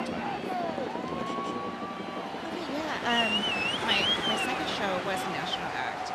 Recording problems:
train or aircraft noise; very loud; throughout; 4 dB above the speech

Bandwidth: 14 kHz